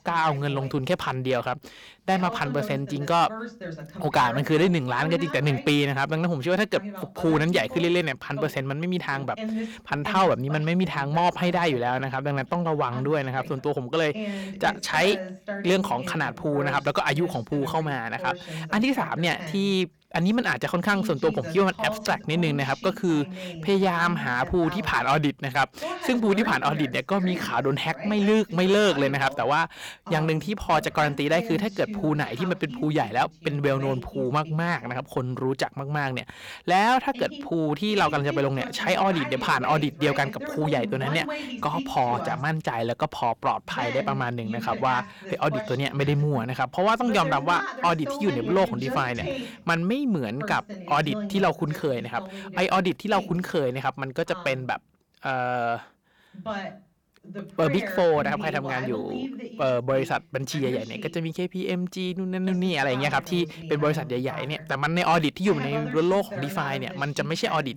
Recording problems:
distortion; slight; 10 dB below the speech
voice in the background; noticeable; throughout; 10 dB below the speech

